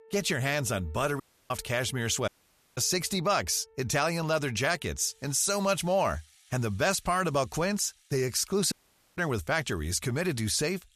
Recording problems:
background music; faint; throughout; 30 dB below the speech
audio cutting out; at 1 s, at 2.5 s and at 8.5 s

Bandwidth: 14.5 kHz